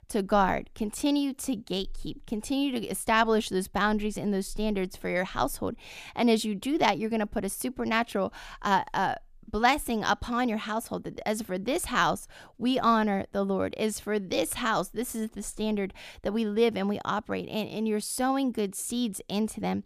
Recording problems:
none

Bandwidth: 14.5 kHz